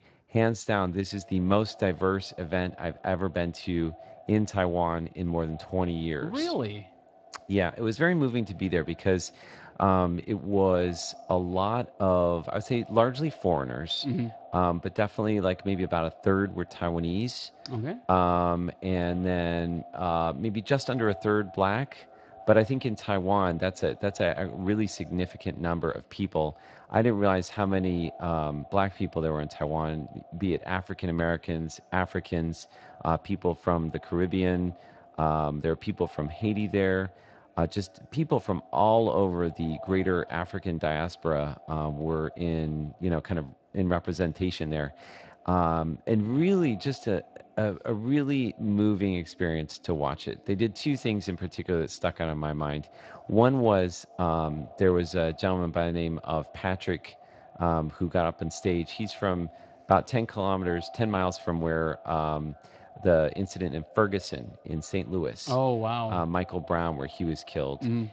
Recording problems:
echo of what is said; faint; throughout; 230 ms later, 20 dB below the speech
garbled, watery; slightly; nothing above 7.5 kHz

